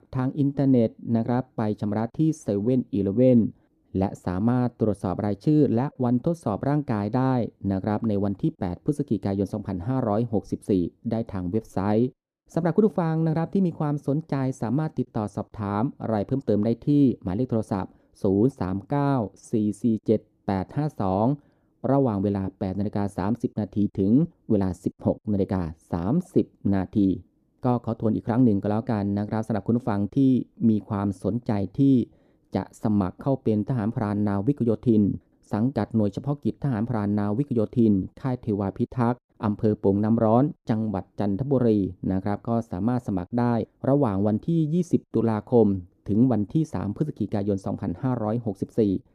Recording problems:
muffled; very; fading above 1 kHz

